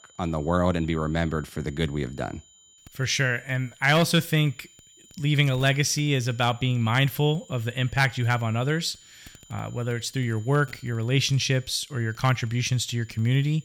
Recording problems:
high-pitched whine; faint; throughout; 7 kHz, 25 dB below the speech

